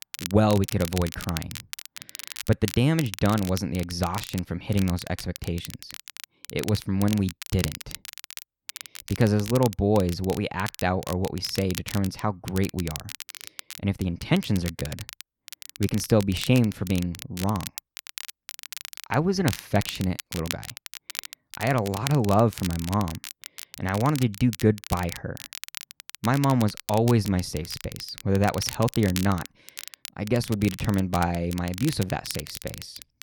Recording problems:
crackle, like an old record; noticeable; 10 dB below the speech

